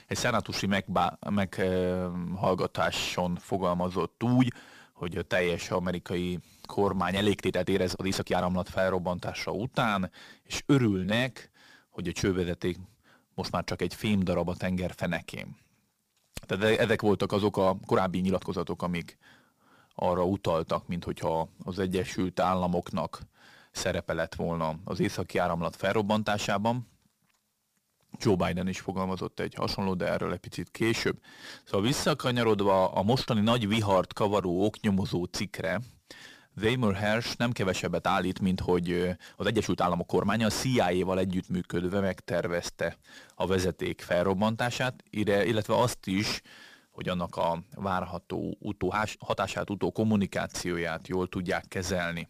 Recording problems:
distortion; slight; 10 dB below the speech
uneven, jittery; strongly; from 0.5 to 51 s

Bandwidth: 15 kHz